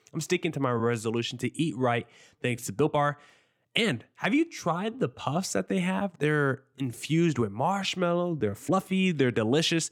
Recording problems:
uneven, jittery; strongly; from 0.5 to 9 s

